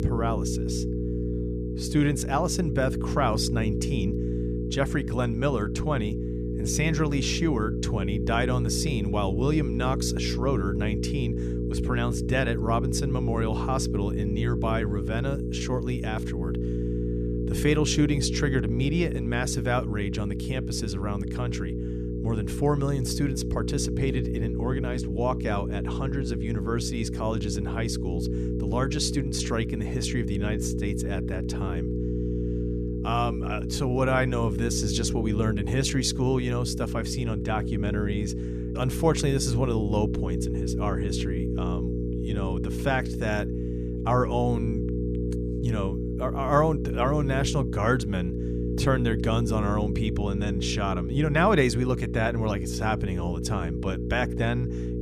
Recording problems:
electrical hum; loud; throughout; 60 Hz, 6 dB below the speech

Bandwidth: 14.5 kHz